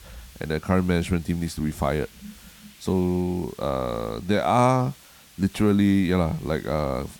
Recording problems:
hiss; faint; throughout; 25 dB below the speech

